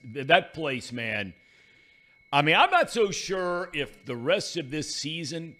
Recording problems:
high-pitched whine; faint; throughout; 2 kHz, 30 dB below the speech

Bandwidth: 15 kHz